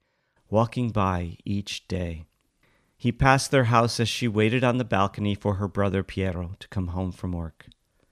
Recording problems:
none

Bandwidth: 14 kHz